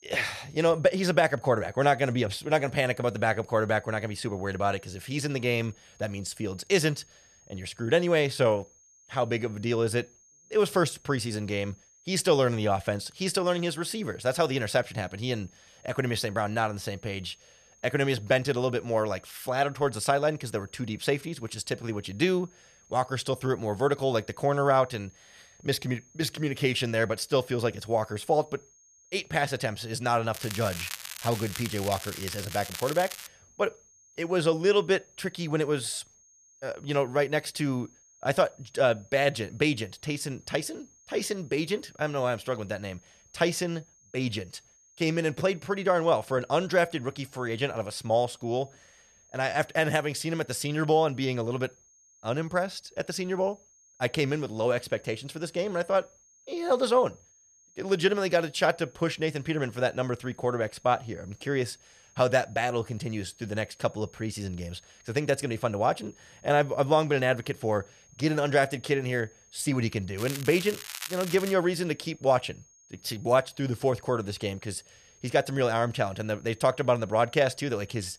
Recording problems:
crackling; loud; from 30 to 33 s and from 1:10 to 1:12; 10 dB below the speech
high-pitched whine; faint; throughout; 6.5 kHz, 30 dB below the speech

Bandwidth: 14.5 kHz